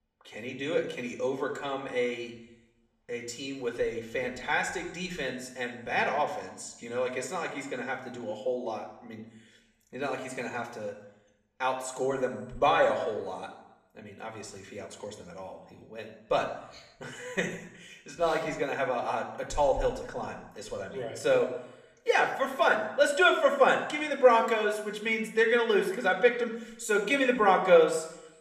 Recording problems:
room echo; slight; dies away in 0.8 s
off-mic speech; somewhat distant

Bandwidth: 14.5 kHz